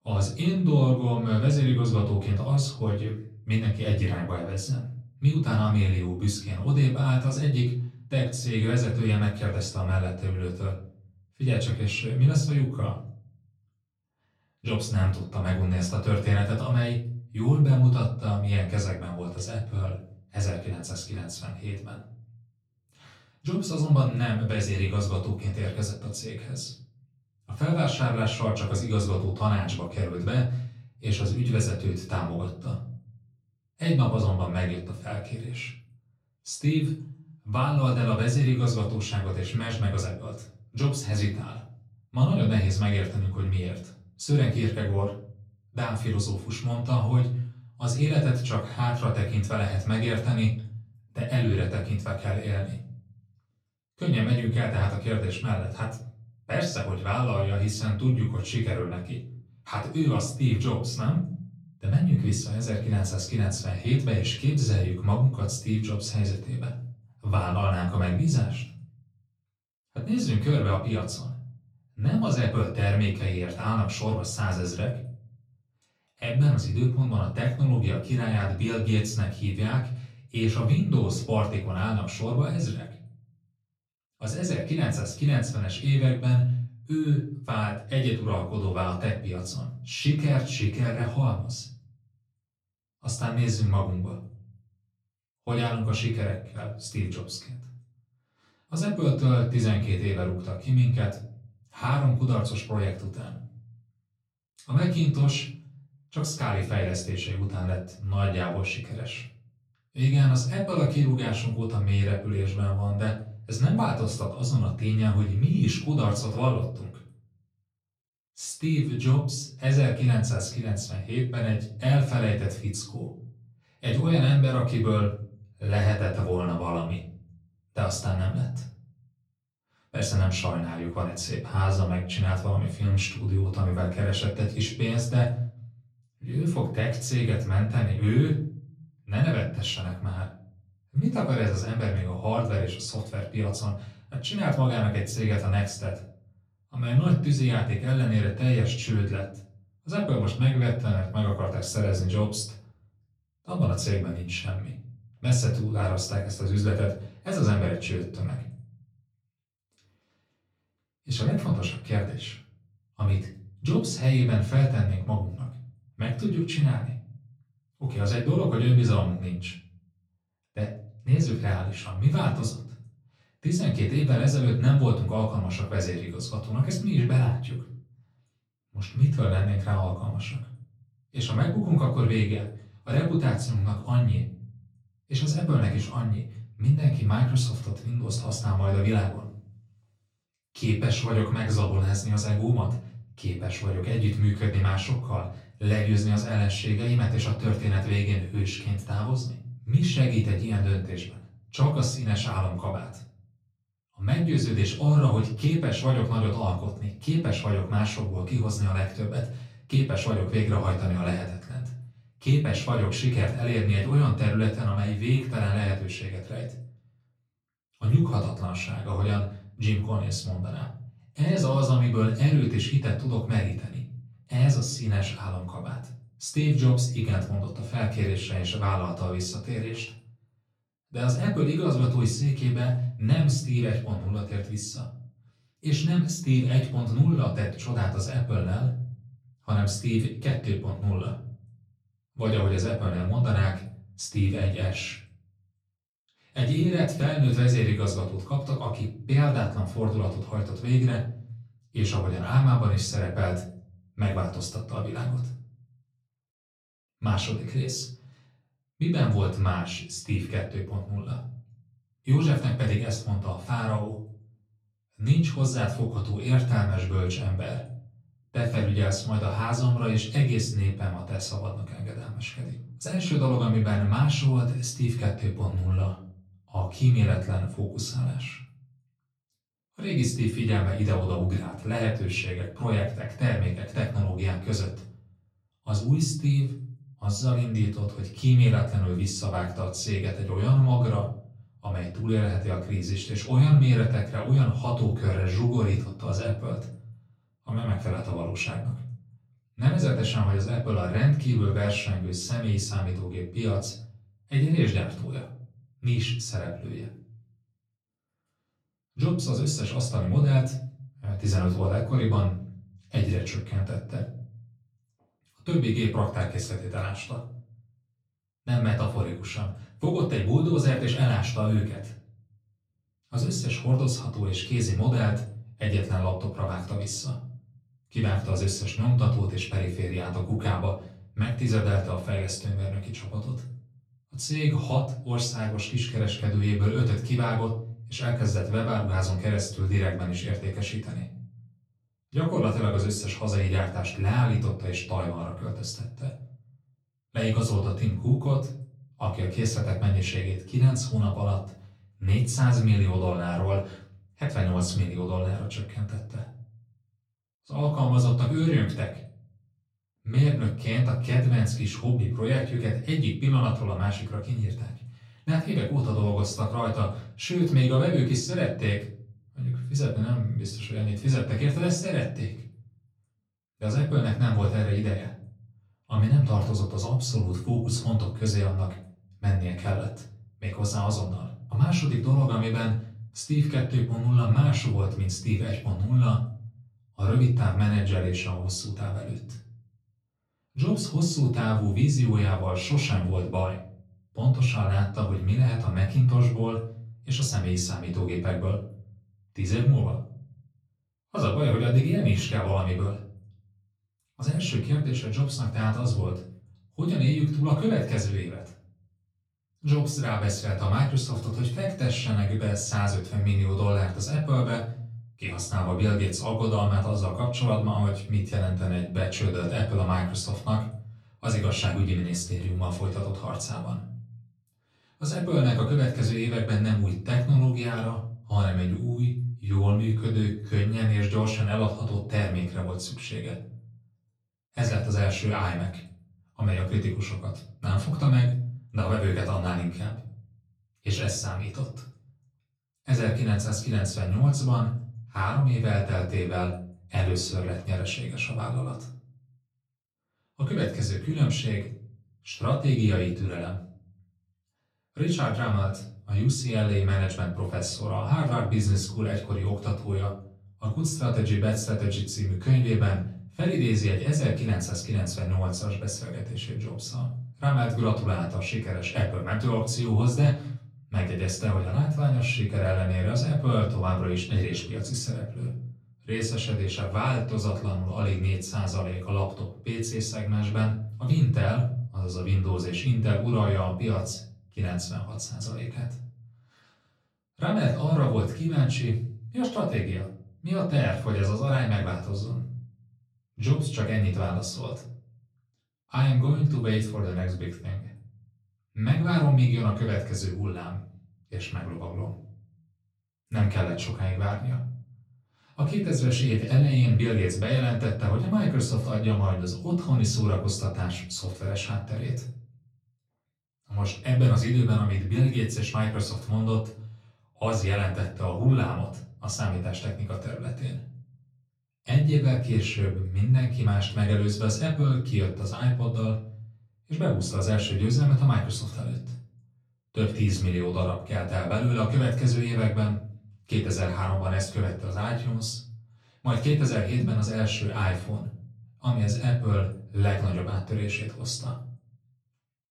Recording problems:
off-mic speech; far
room echo; slight; dies away in 0.6 s

